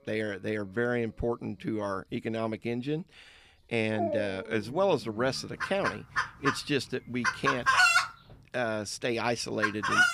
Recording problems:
animal sounds; very loud; throughout; 3 dB above the speech

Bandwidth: 15 kHz